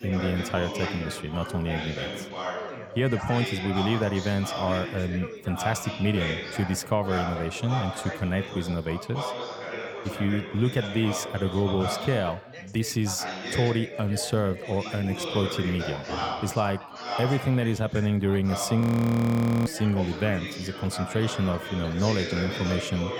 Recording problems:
background chatter; loud; throughout; 4 voices, 6 dB below the speech
audio freezing; at 19 s for 1 s

